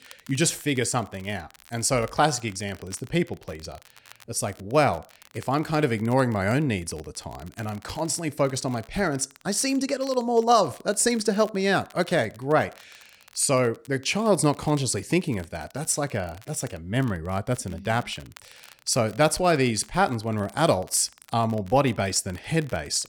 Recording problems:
crackle, like an old record; faint; 25 dB below the speech

